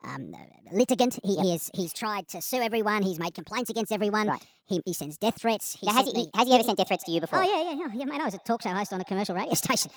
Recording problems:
wrong speed and pitch; too fast and too high; 1.5 times normal speed
echo of what is said; faint; from 7 s on; 120 ms later, 25 dB below the speech

